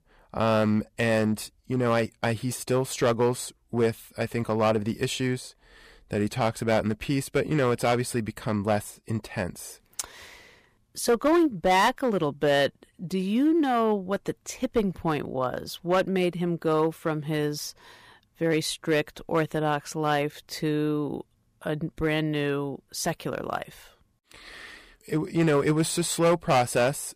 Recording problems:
distortion; slight; 4% of the sound clipped

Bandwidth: 15 kHz